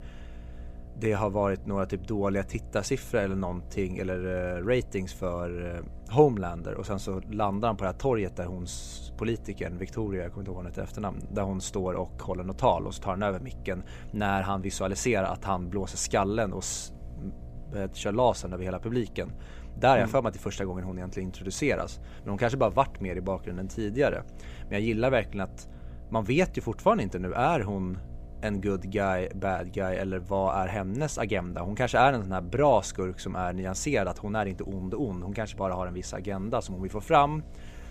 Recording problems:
electrical hum; faint; throughout; 60 Hz, 25 dB below the speech

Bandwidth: 15 kHz